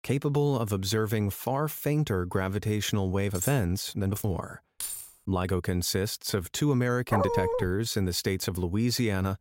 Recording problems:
uneven, jittery; strongly; from 3.5 to 8.5 s
clattering dishes; noticeable; at 3.5 s; peak 6 dB below the speech
jangling keys; noticeable; at 5 s; peak 6 dB below the speech
dog barking; loud; at 7 s; peak 1 dB above the speech

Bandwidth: 16 kHz